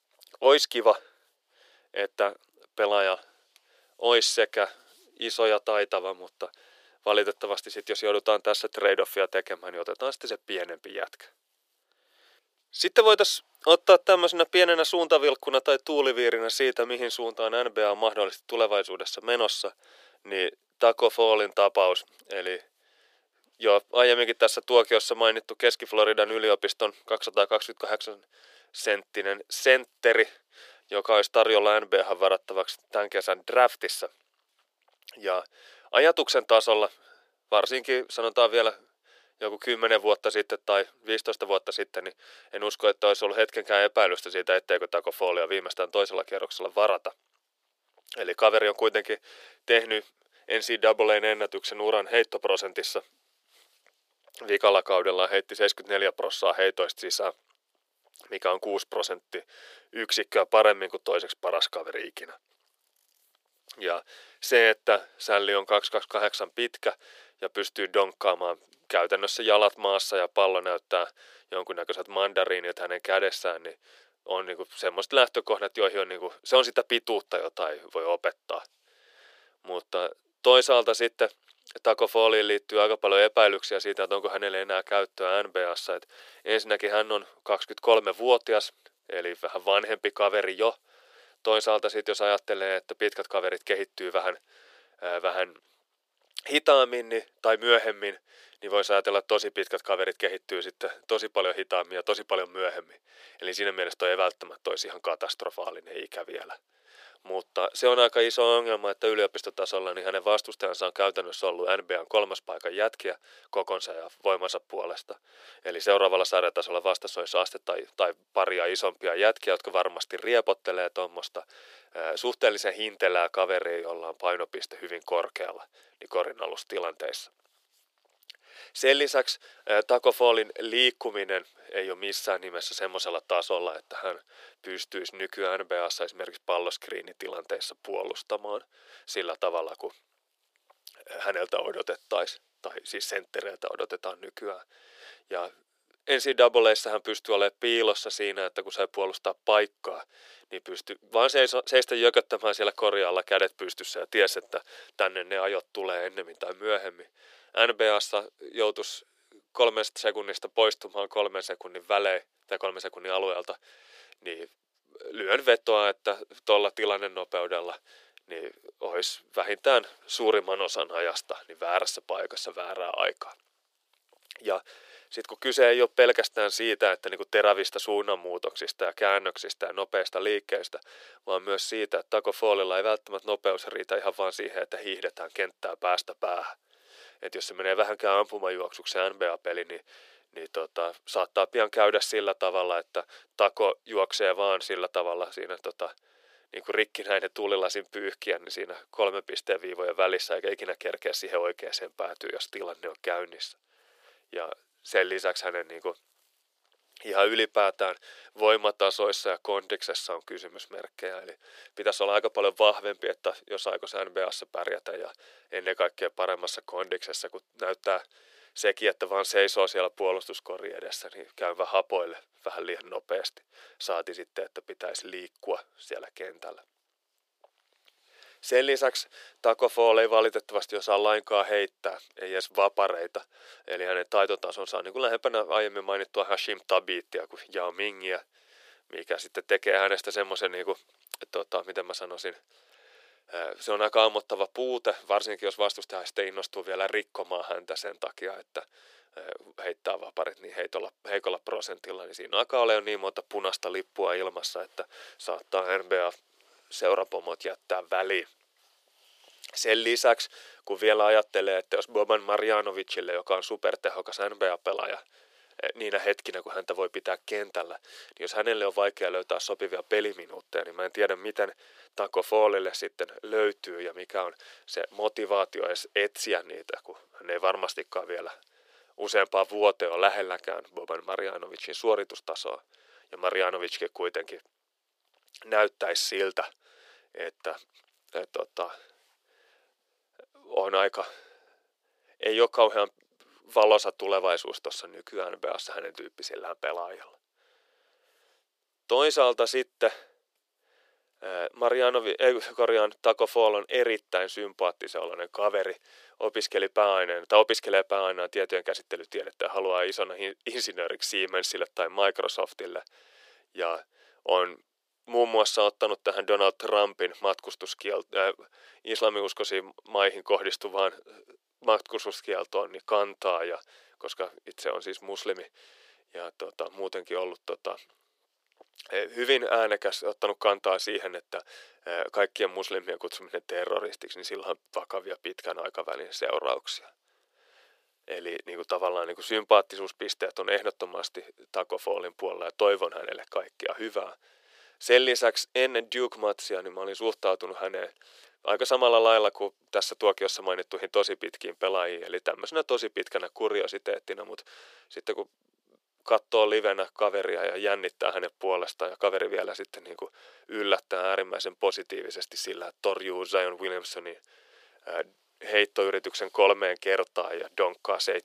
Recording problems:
thin; very; fading below 400 Hz

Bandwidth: 15 kHz